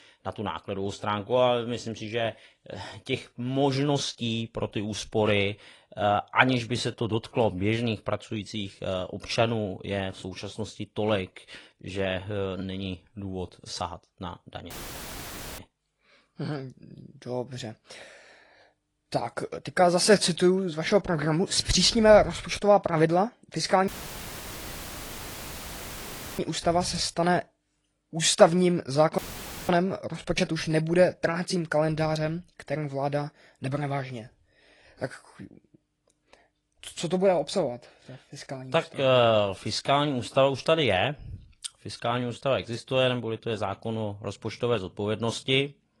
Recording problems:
garbled, watery; slightly; nothing above 10.5 kHz
audio cutting out; filled with static; at 15 s for 1 s, at 24 s for 2.5 s and at 29 s for 0.5 s

